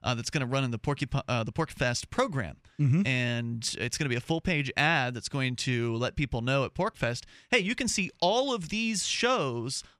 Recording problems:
none

